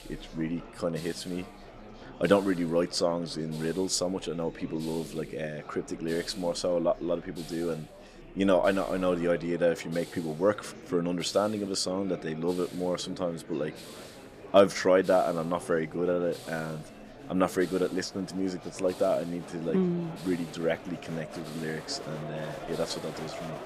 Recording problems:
chatter from many people; noticeable; throughout; 15 dB below the speech
hiss; faint; throughout; 20 dB below the speech

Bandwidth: 15 kHz